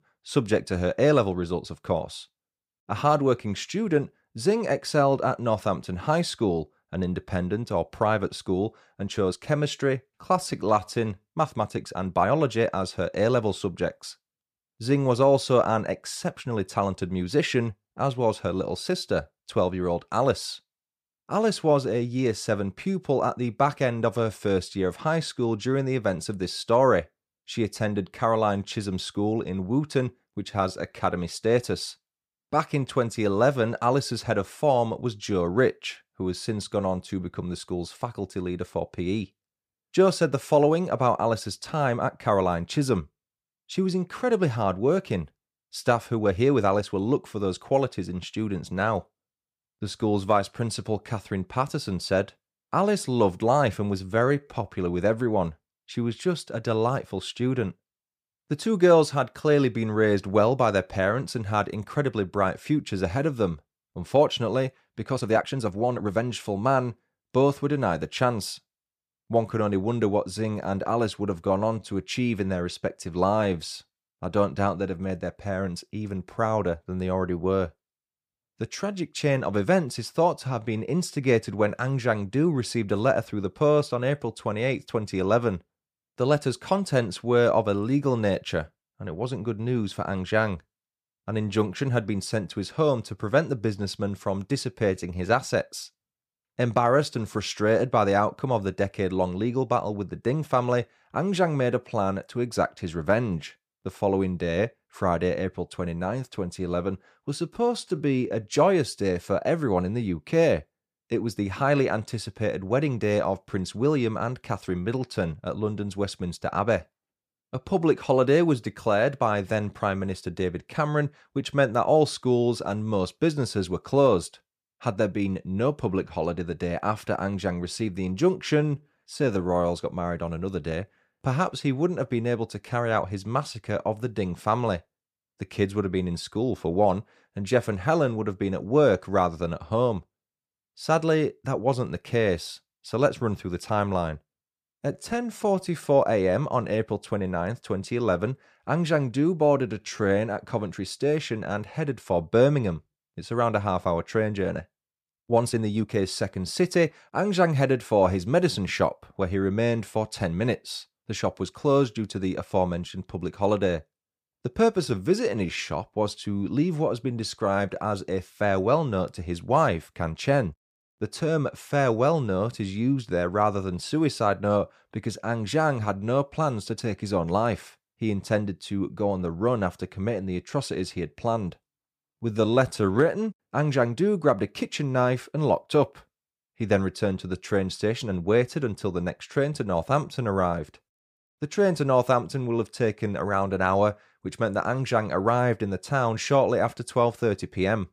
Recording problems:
uneven, jittery; strongly; from 9 s to 3:11

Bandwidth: 15 kHz